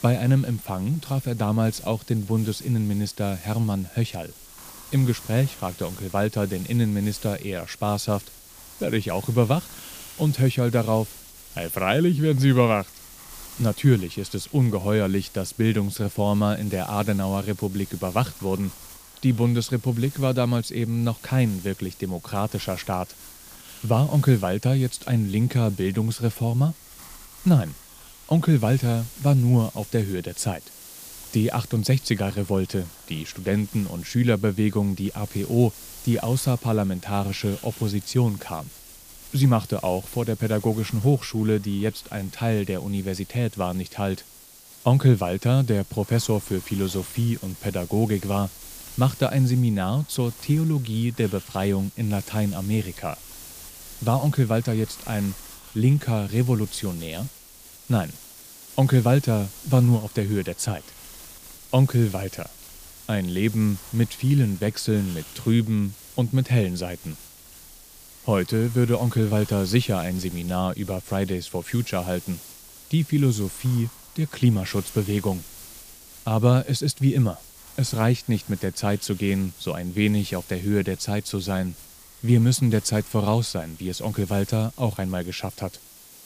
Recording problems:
hiss; noticeable; throughout; 20 dB below the speech

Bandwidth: 15 kHz